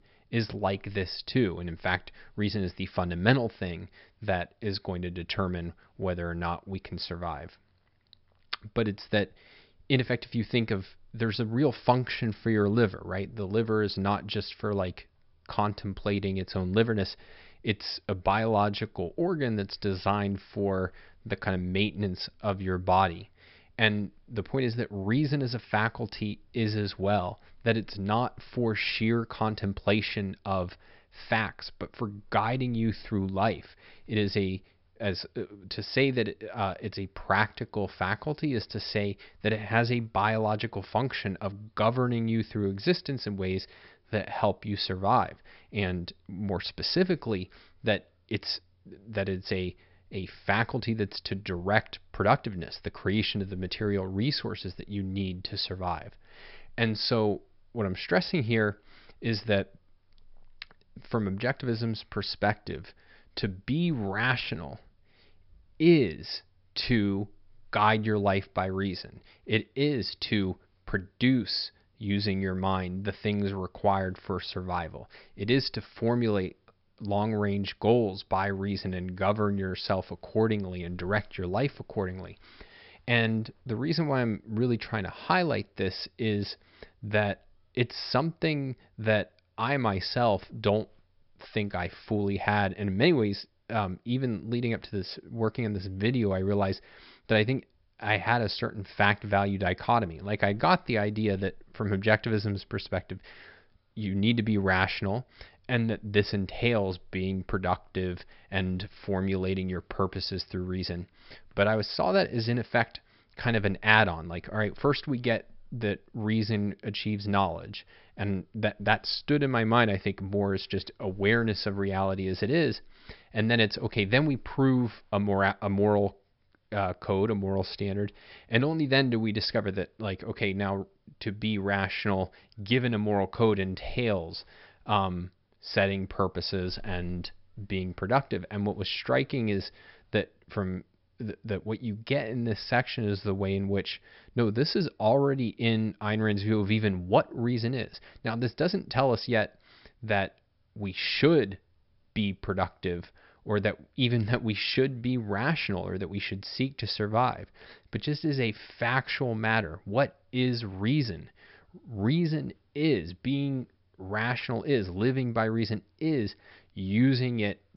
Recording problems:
high frequencies cut off; noticeable; nothing above 5.5 kHz

